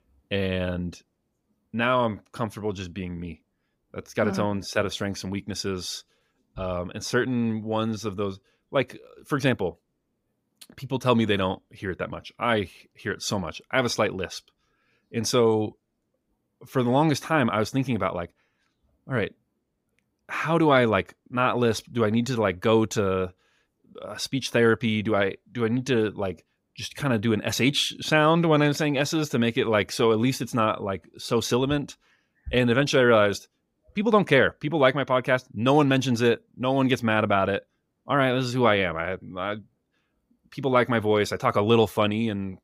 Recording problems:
none

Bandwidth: 15.5 kHz